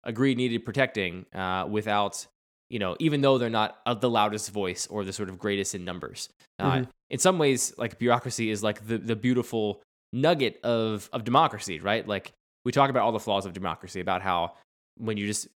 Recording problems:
none

